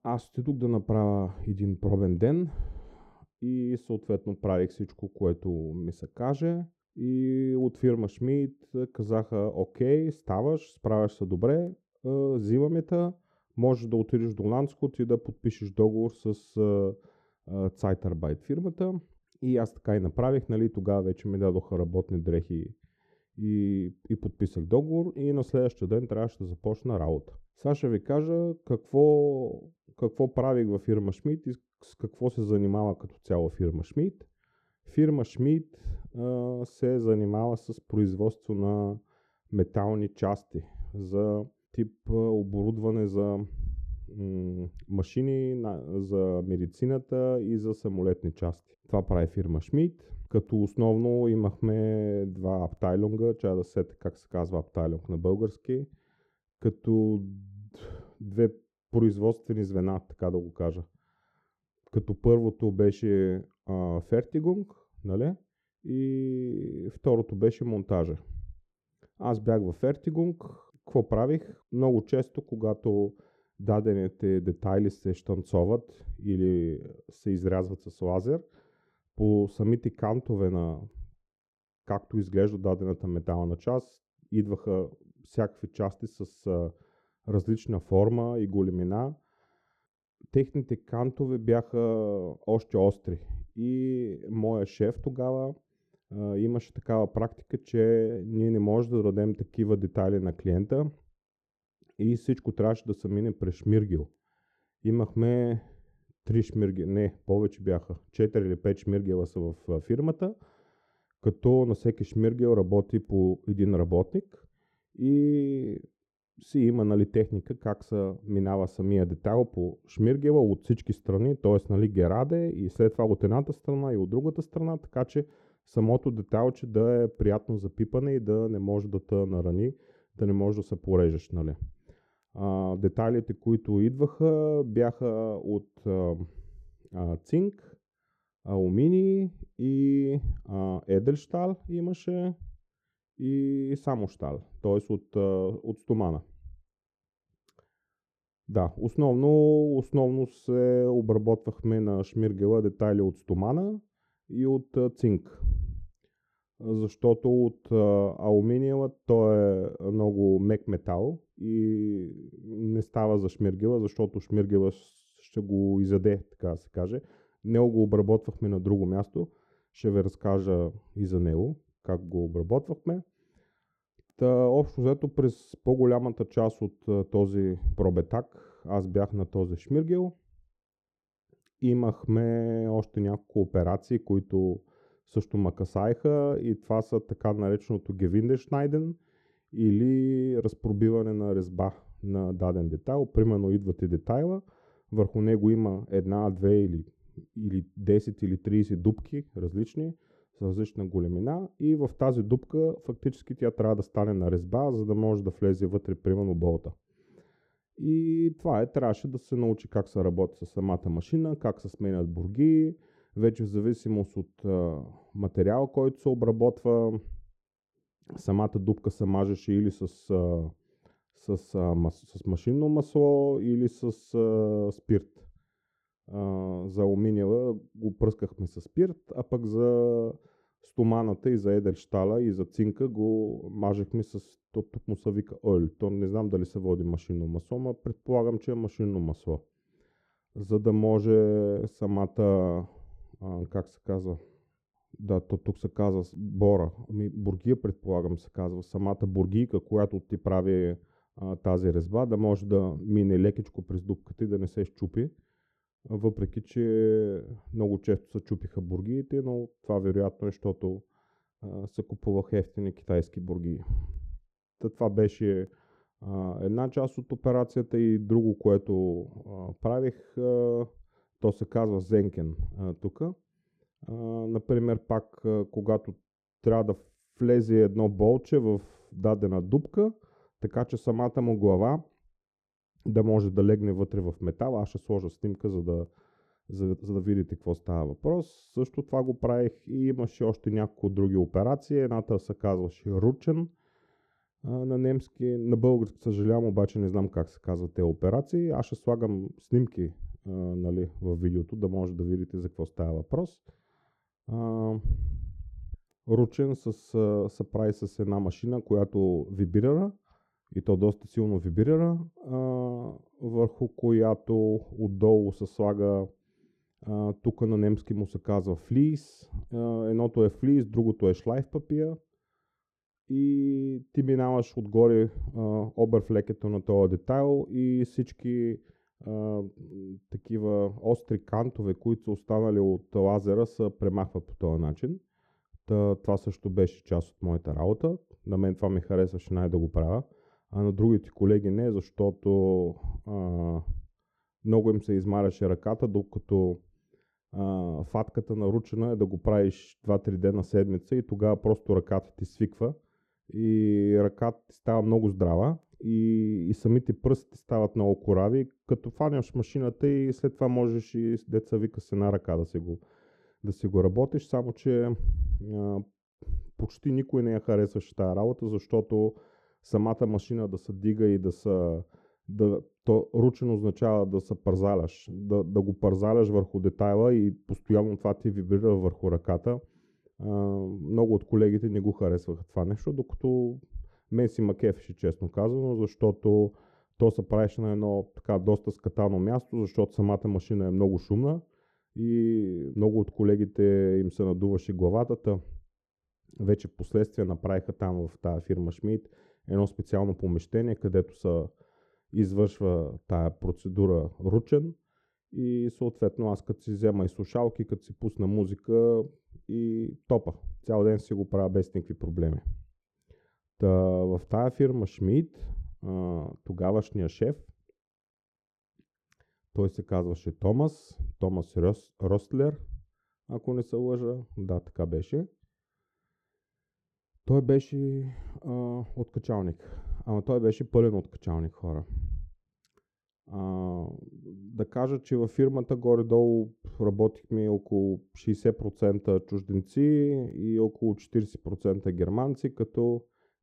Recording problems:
muffled; very; fading above 1.5 kHz

